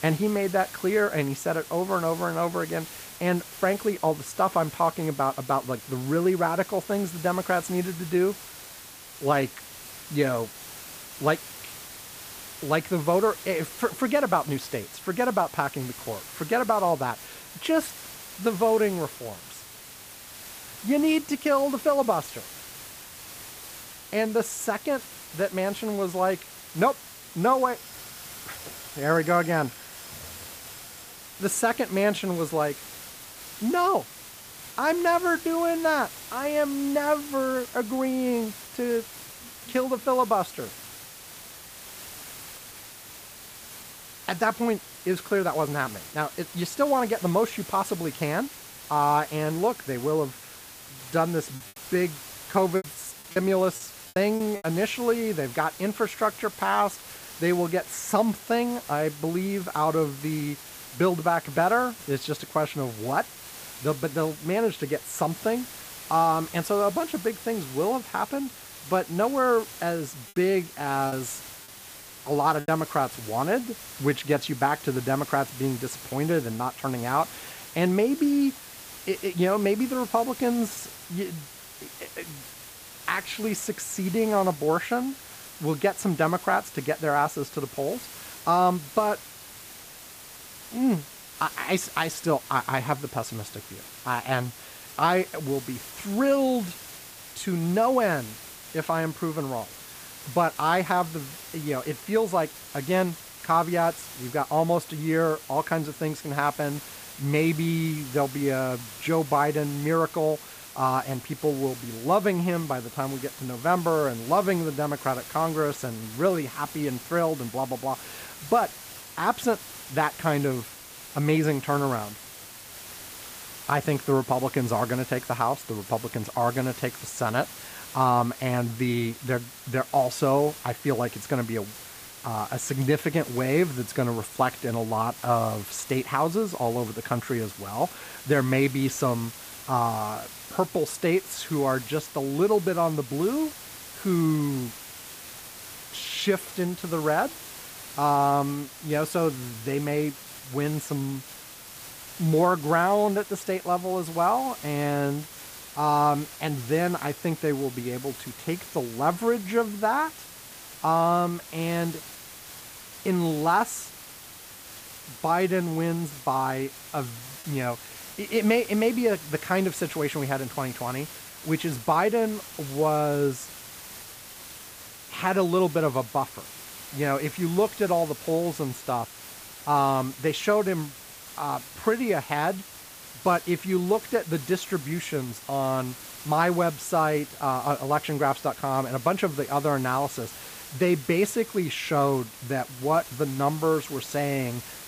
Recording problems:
hiss; noticeable; throughout; 15 dB below the speech
high-pitched whine; faint; throughout; 10.5 kHz, 35 dB below the speech
choppy; very; from 52 to 55 s and from 1:11 to 1:13; 6% of the speech affected

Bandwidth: 15 kHz